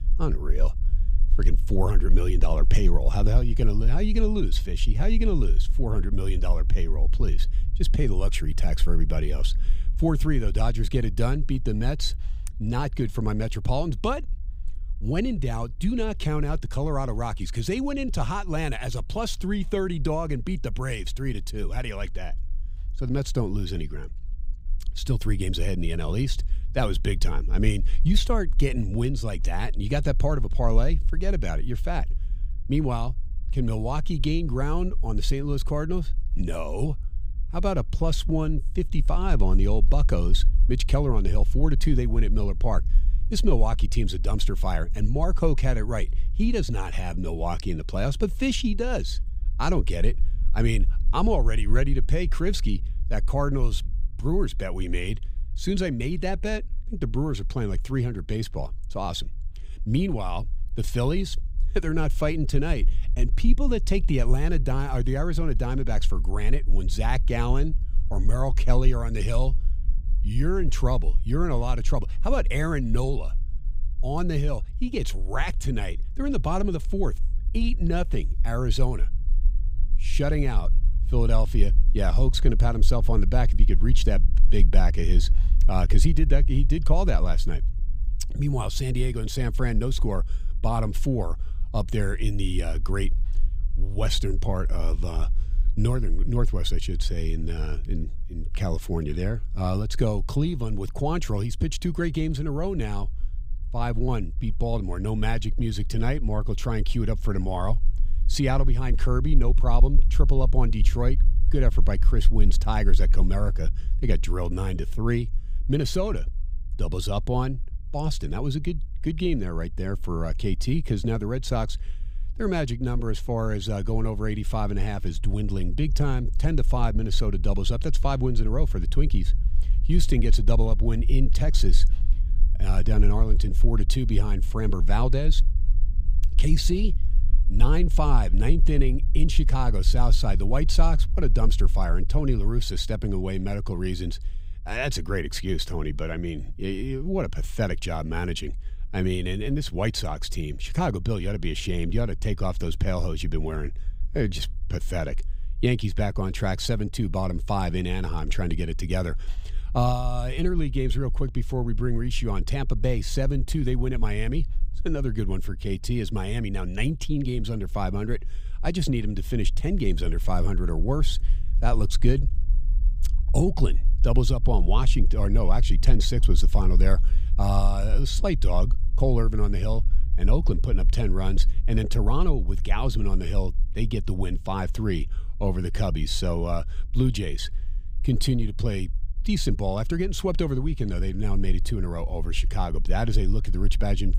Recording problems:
low rumble; faint; throughout; 20 dB below the speech

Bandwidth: 15.5 kHz